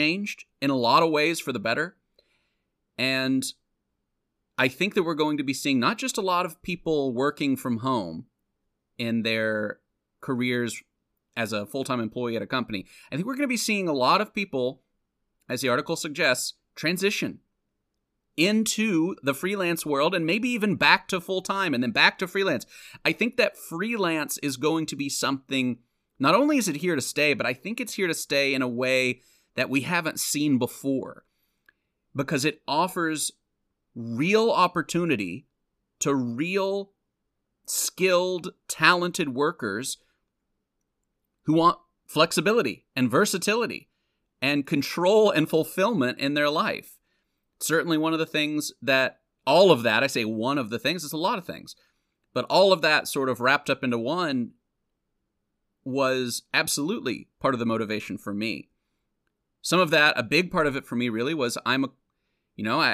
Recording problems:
abrupt cut into speech; at the start and the end

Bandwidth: 14.5 kHz